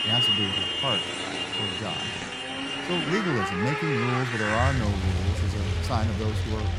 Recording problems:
traffic noise; very loud; throughout; 4 dB above the speech

